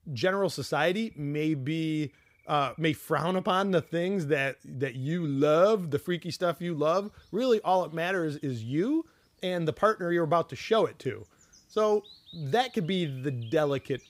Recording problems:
animal sounds; faint; throughout; 30 dB below the speech

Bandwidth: 15.5 kHz